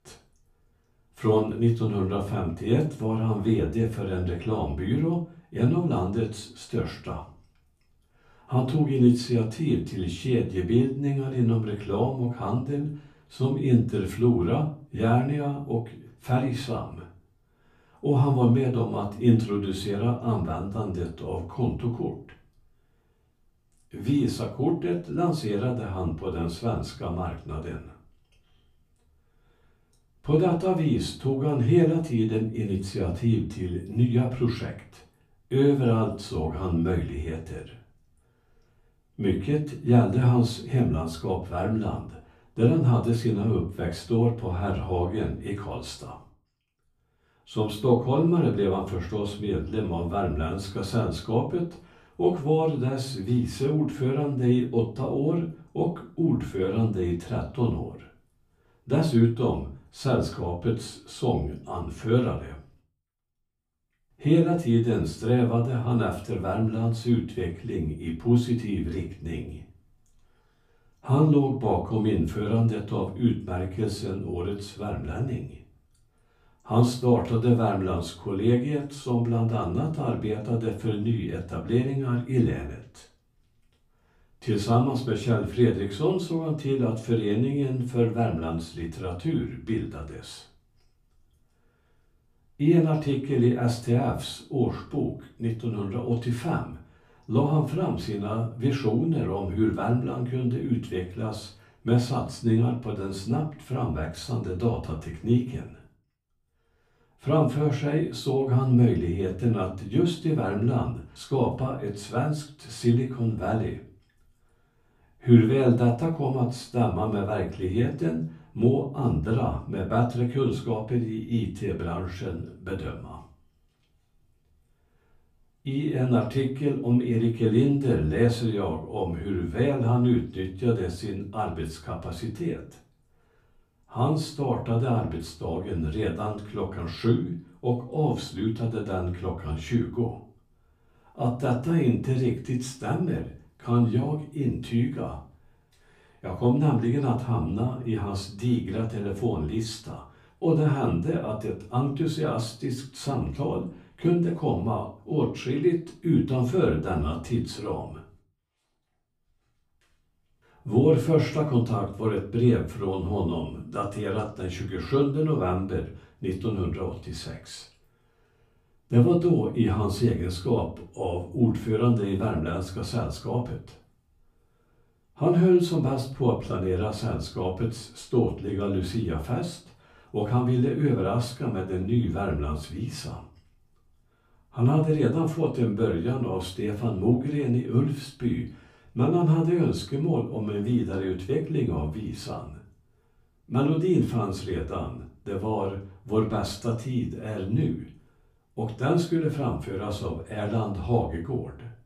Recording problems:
off-mic speech; far
room echo; slight; dies away in 0.3 s

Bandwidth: 15 kHz